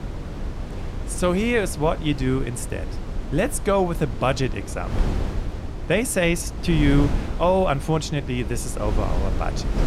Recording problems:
wind noise on the microphone; occasional gusts; 10 dB below the speech

